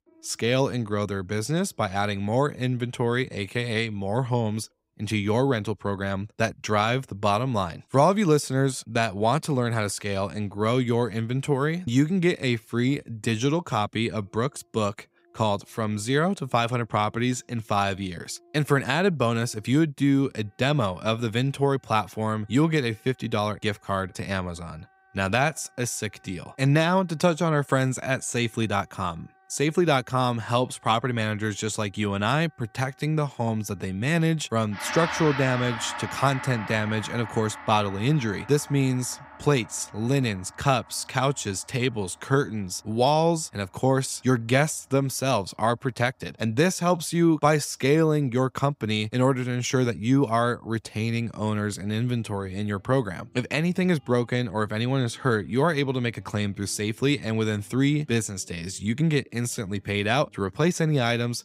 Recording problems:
background music; noticeable; throughout; 15 dB below the speech

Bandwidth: 15.5 kHz